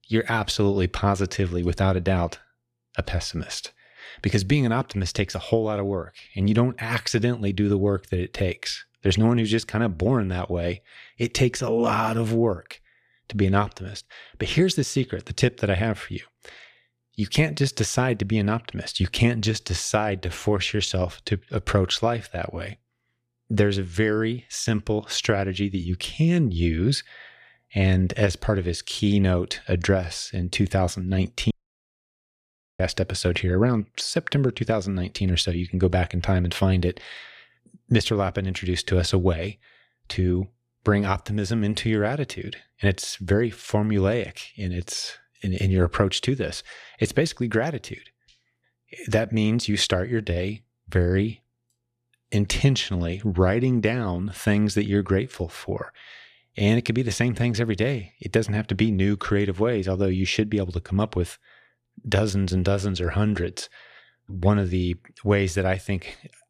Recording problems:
audio cutting out; at 32 s for 1.5 s

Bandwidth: 14.5 kHz